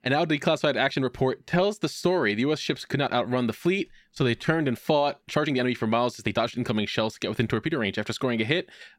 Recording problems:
uneven, jittery; strongly; from 1 to 8 s

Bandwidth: 16 kHz